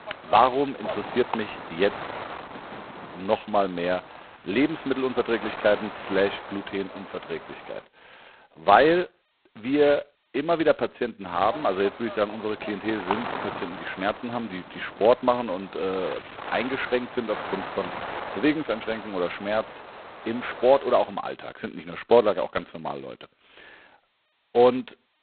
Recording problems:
phone-call audio; poor line; nothing above 4 kHz
wind noise on the microphone; occasional gusts; until 8 s and from 11 to 21 s; 10 dB below the speech

